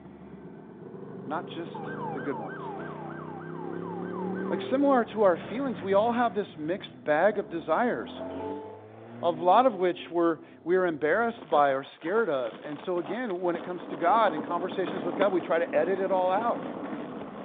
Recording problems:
phone-call audio; nothing above 3.5 kHz
traffic noise; noticeable; throughout; 10 dB below the speech
siren; faint; from 1.5 to 4.5 s; peak 10 dB below the speech
alarm; faint; at 8 s; peak 10 dB below the speech

